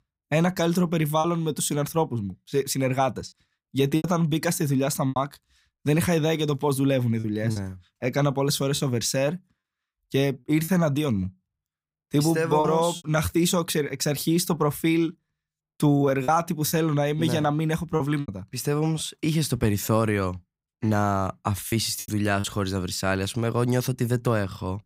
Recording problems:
choppy; occasionally; 4% of the speech affected

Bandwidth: 15.5 kHz